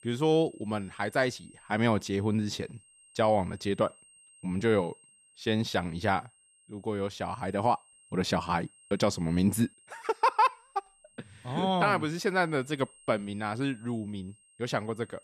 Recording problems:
high-pitched whine; faint; throughout; 8.5 kHz, 25 dB below the speech

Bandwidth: 14 kHz